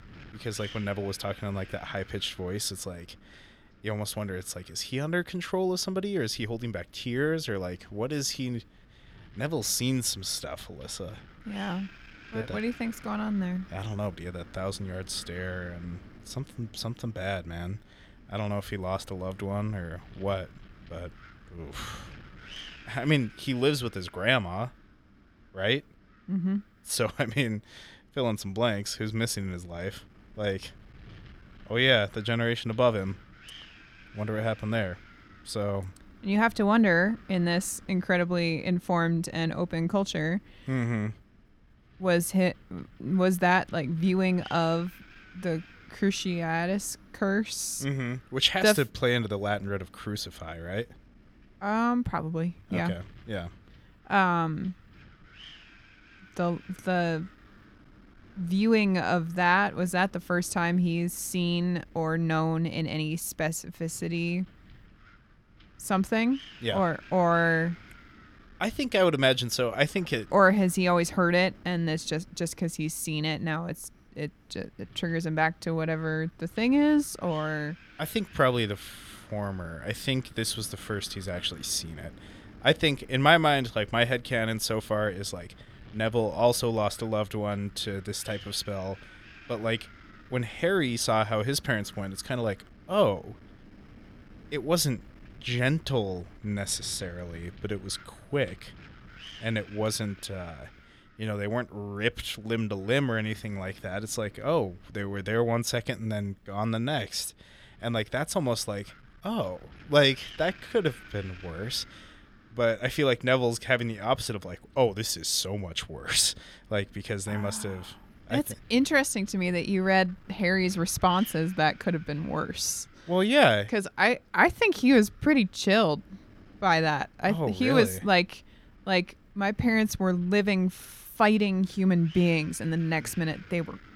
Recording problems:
wind noise on the microphone; occasional gusts; 25 dB below the speech

